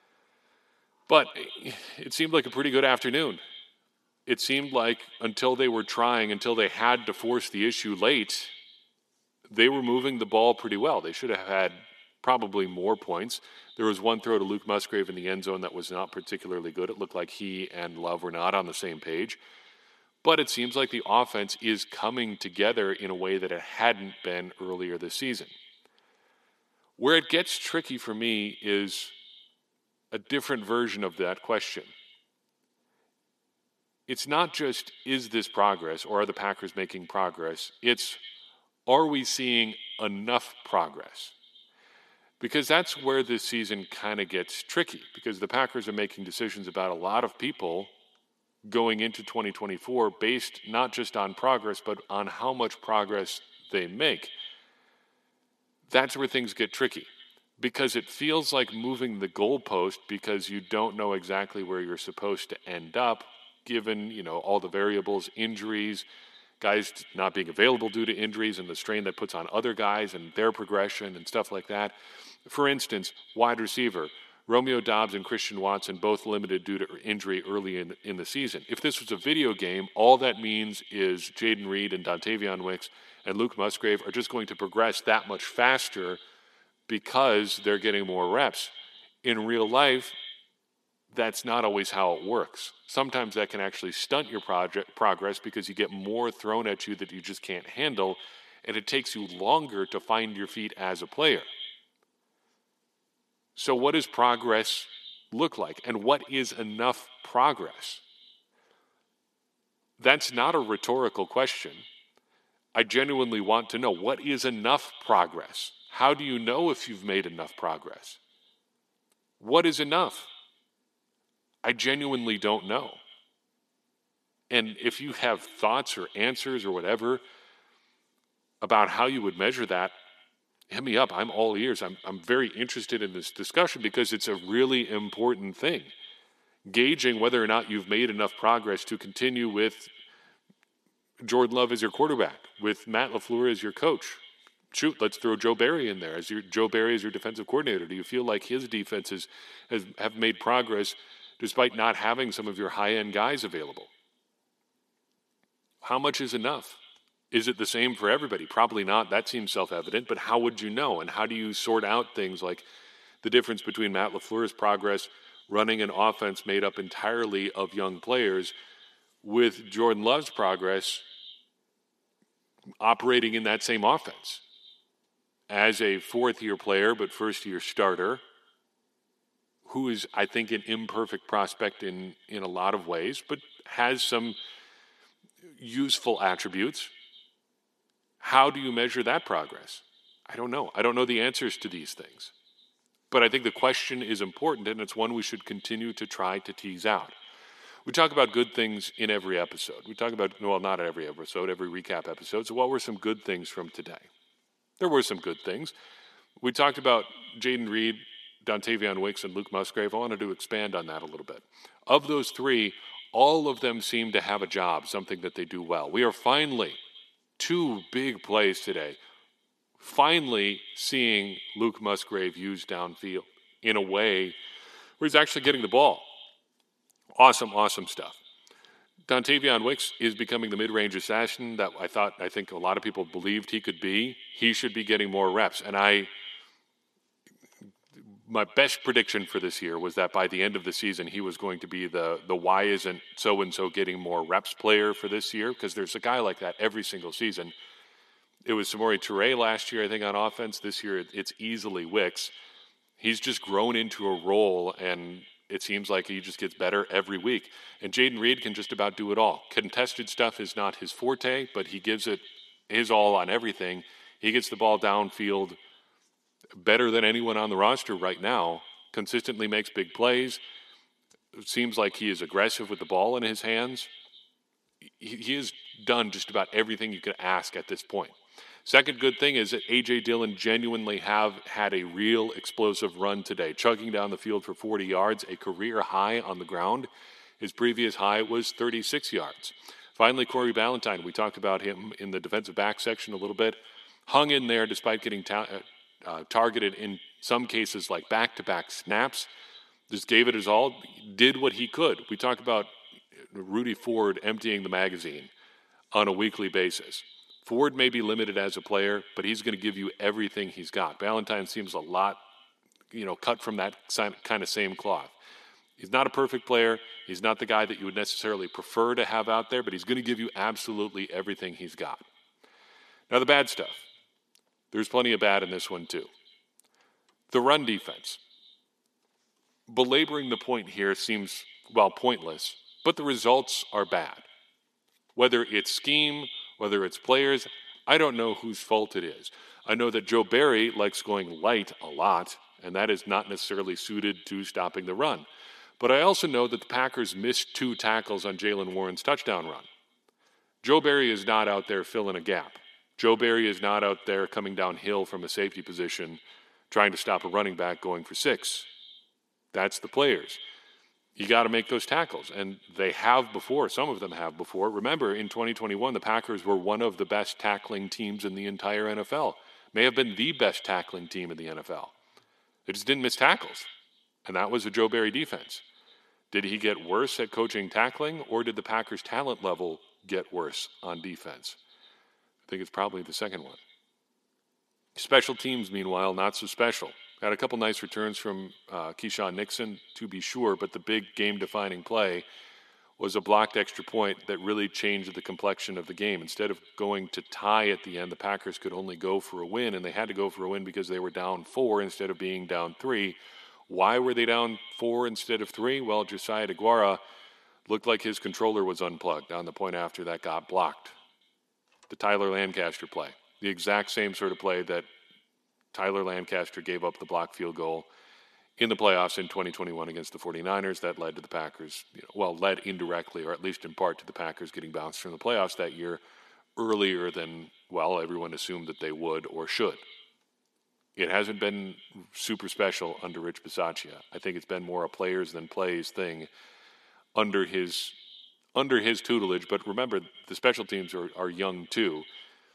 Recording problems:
thin; somewhat; fading below 350 Hz
echo of what is said; faint; throughout; 120 ms later, 20 dB below the speech

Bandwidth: 13.5 kHz